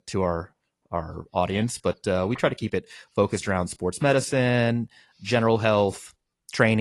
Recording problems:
garbled, watery; slightly
abrupt cut into speech; at the end

